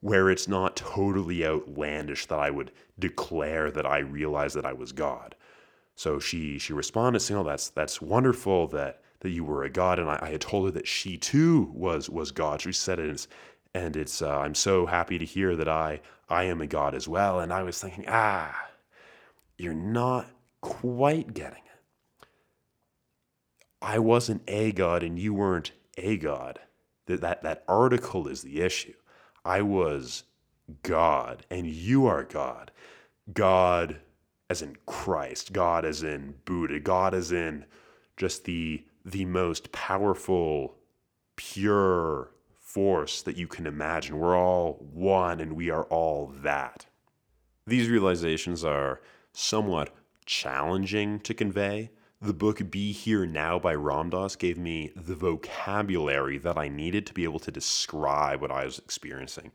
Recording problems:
none

